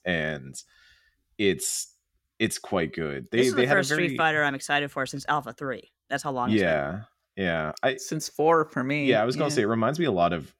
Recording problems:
none

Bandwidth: 16.5 kHz